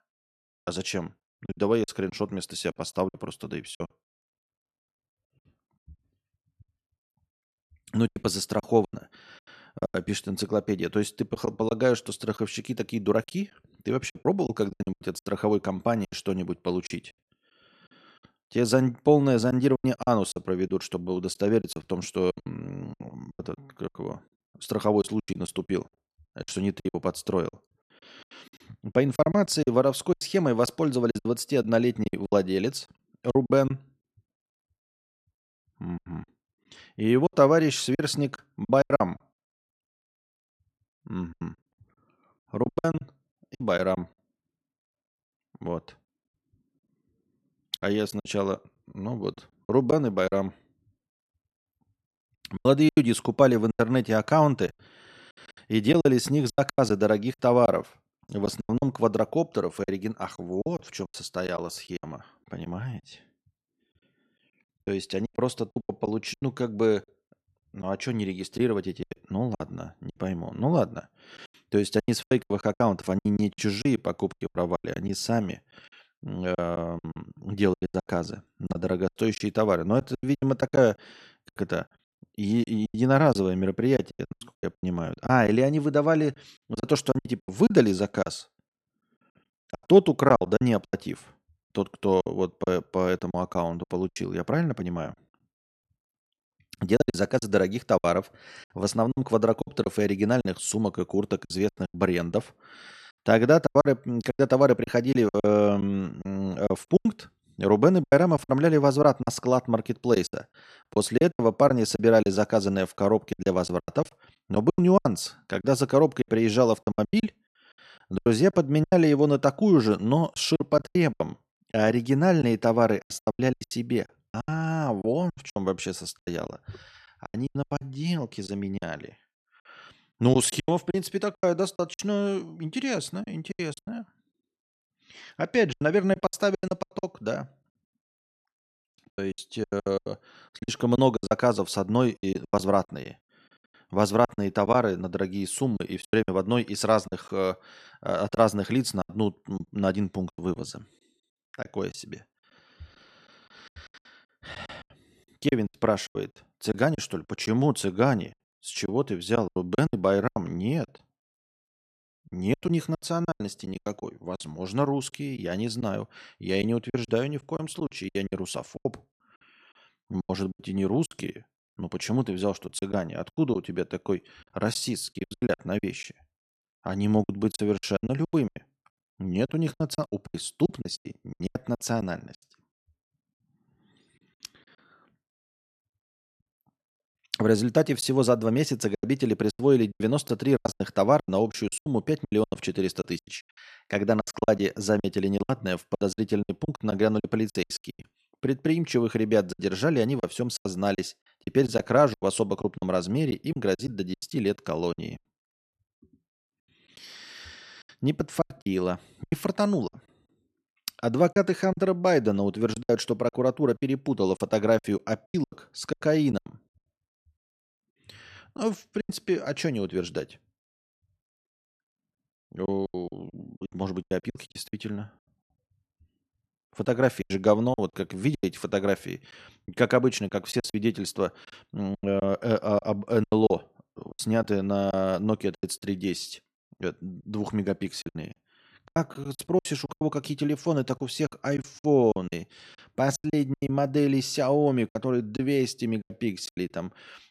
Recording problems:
choppy; very; 14% of the speech affected

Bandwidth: 13.5 kHz